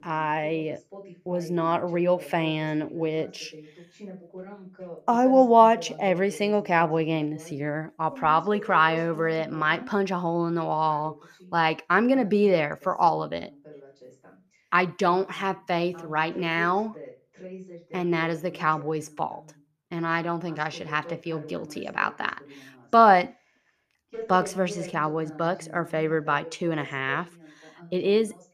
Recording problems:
voice in the background; noticeable; throughout; 20 dB below the speech

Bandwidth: 14.5 kHz